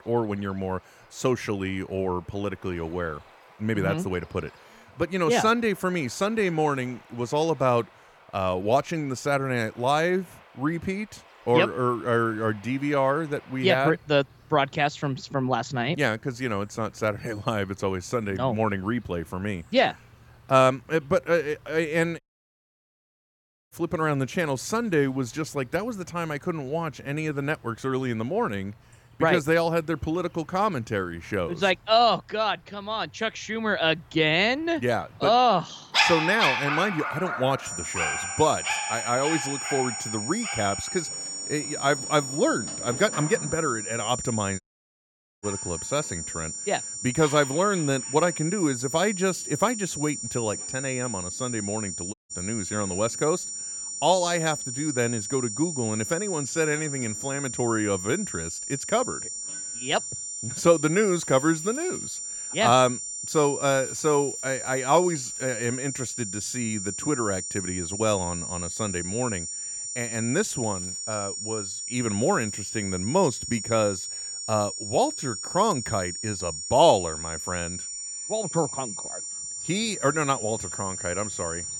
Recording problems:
high-pitched whine; loud; from 38 s on; 7 kHz, 5 dB below the speech
animal sounds; loud; throughout; 5 dB below the speech
audio cutting out; at 22 s for 1.5 s, at 45 s for 1 s and at 52 s

